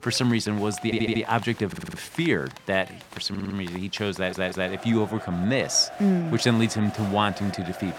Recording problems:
crowd noise; noticeable; throughout; 15 dB below the speech
audio stuttering; 4 times, first at 1 s

